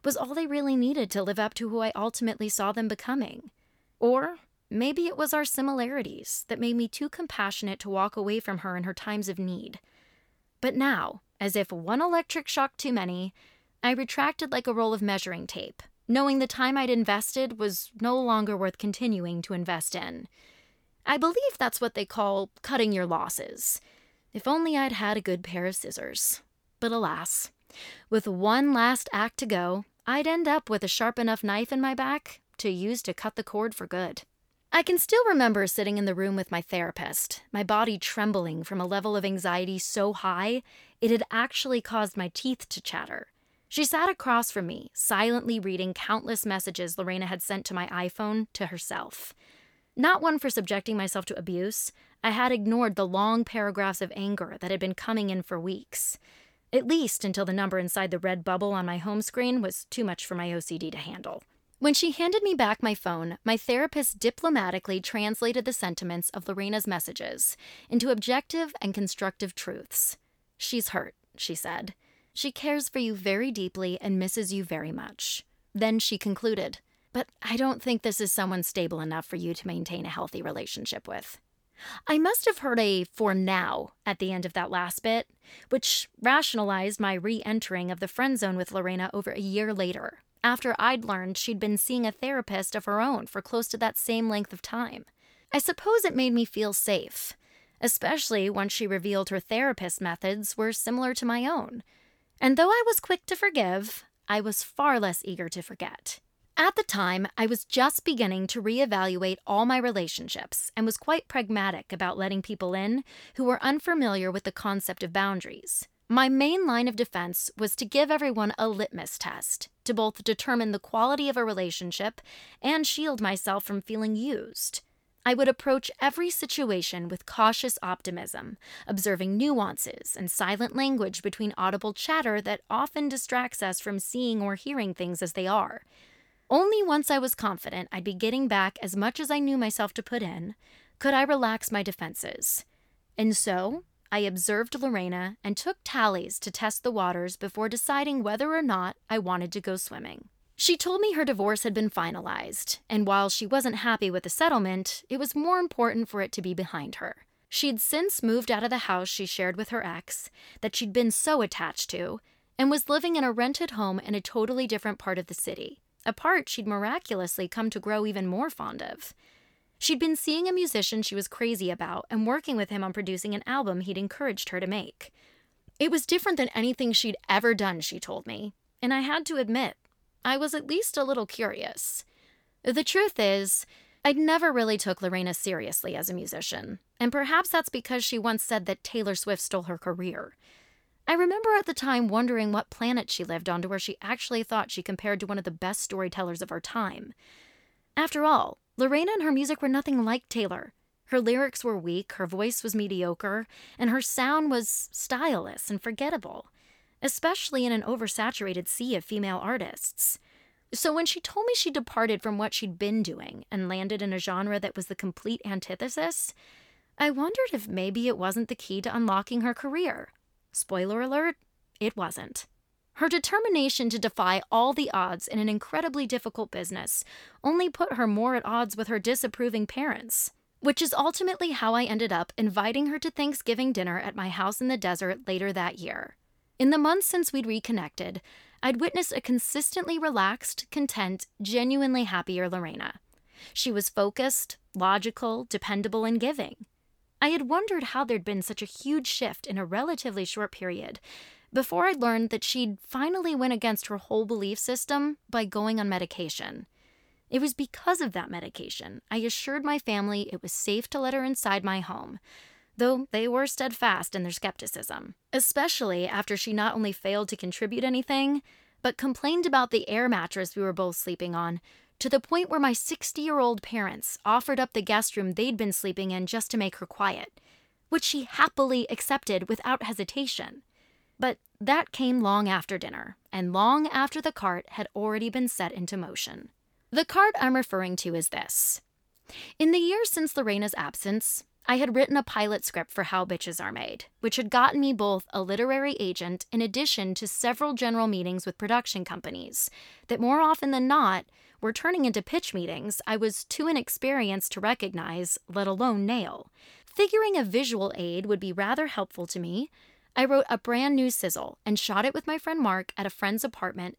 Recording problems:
none

